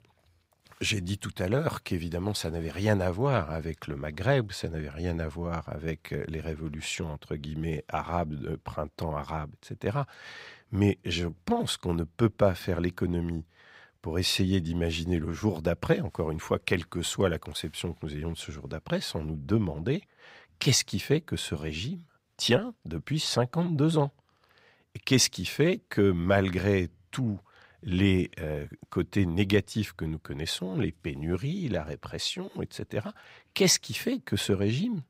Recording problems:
none

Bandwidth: 15.5 kHz